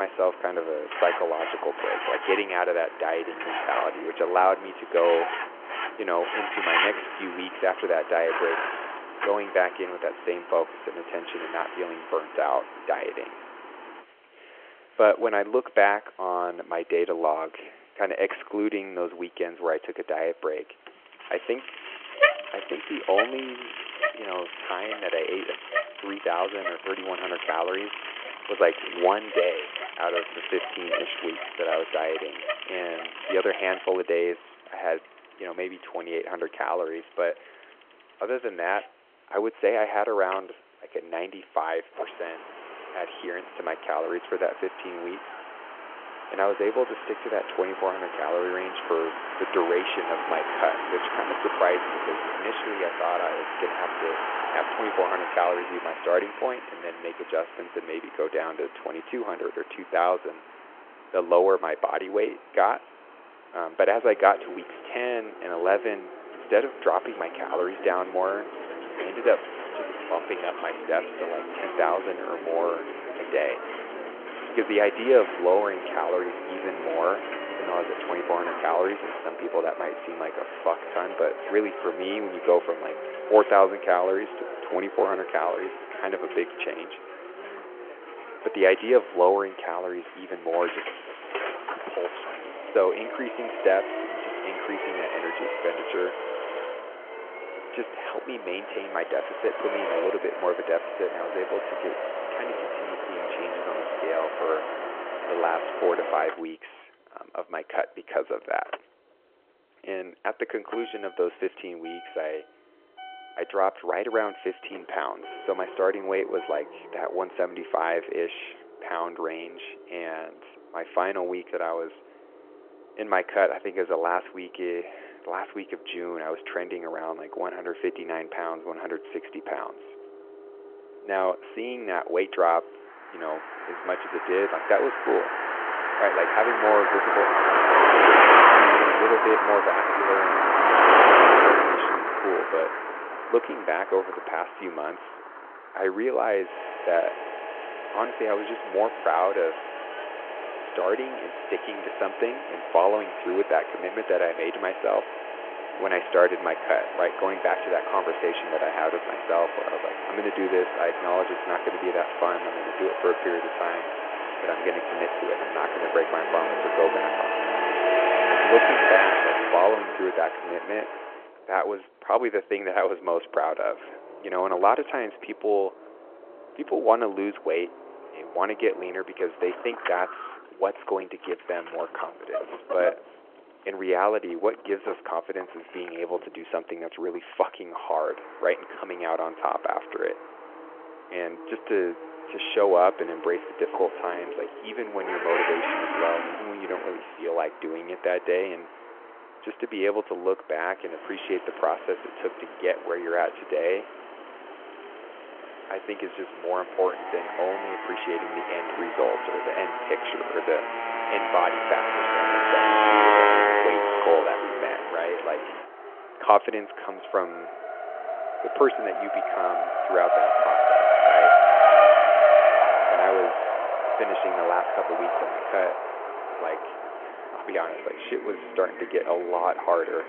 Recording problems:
phone-call audio
traffic noise; very loud; throughout; 2 dB above the speech
abrupt cut into speech; at the start

